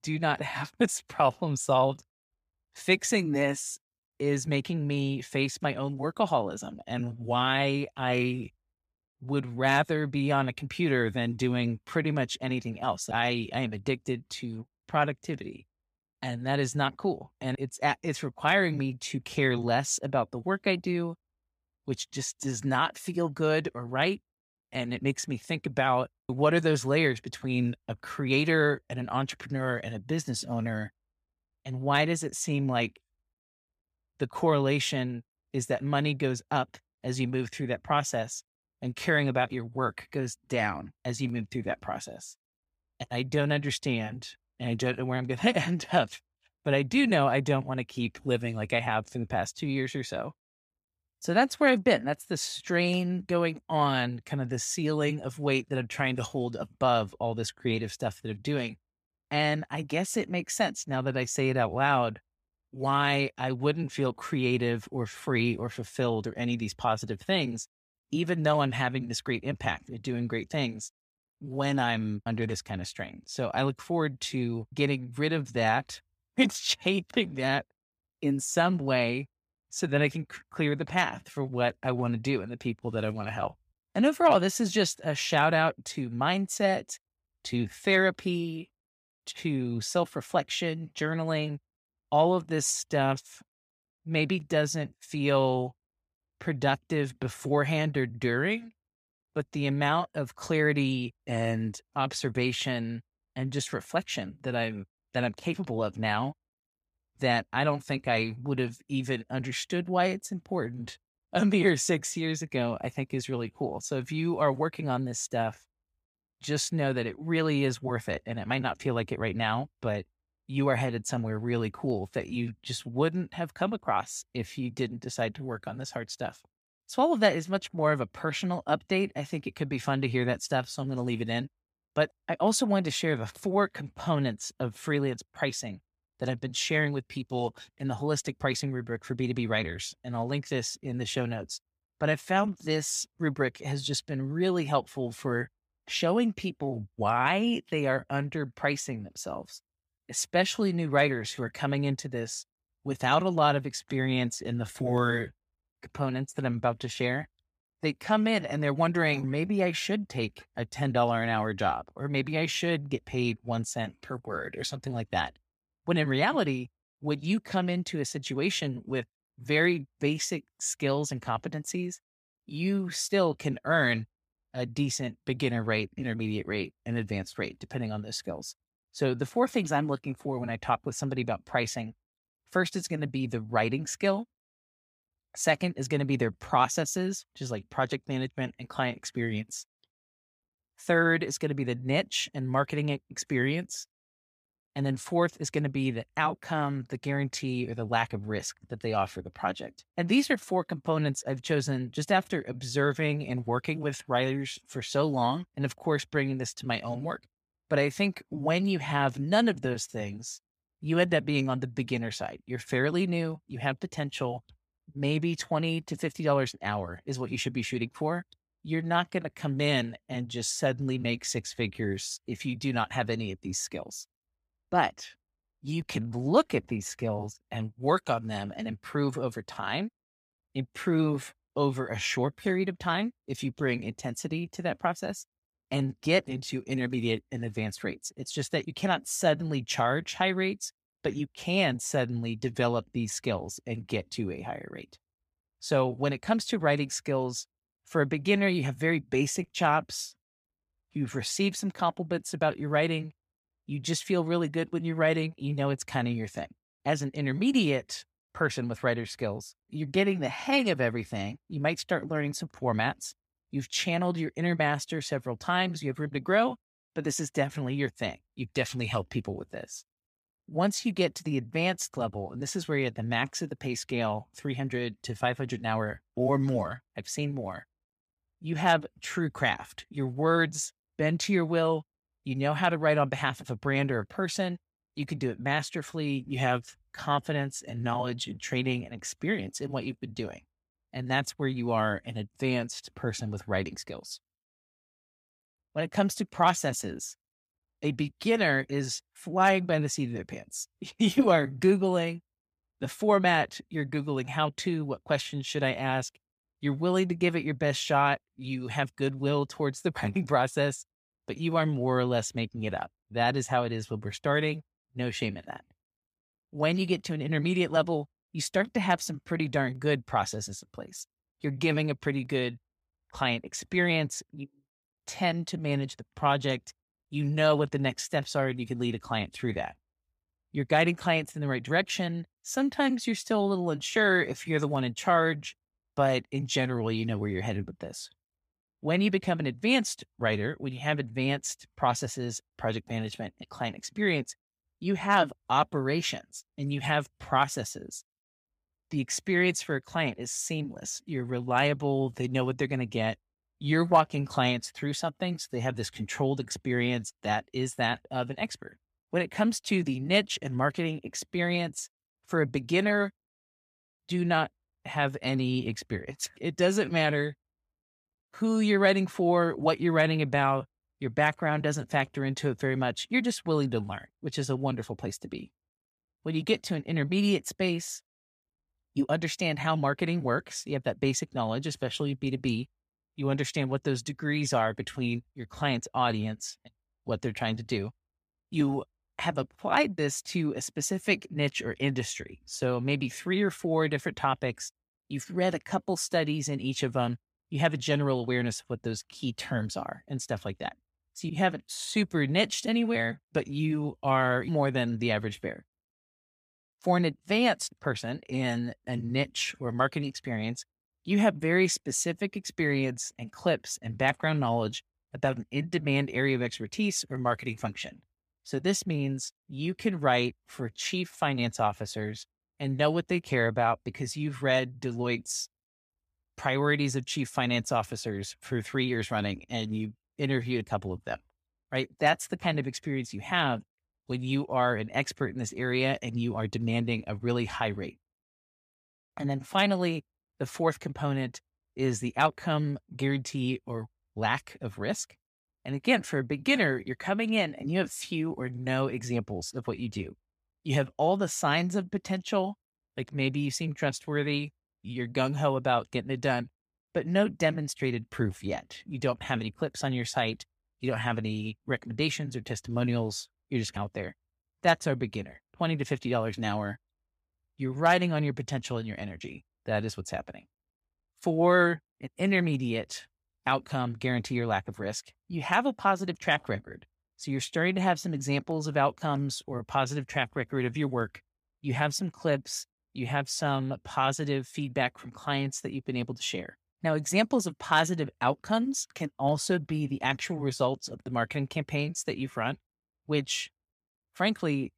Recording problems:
none

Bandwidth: 15 kHz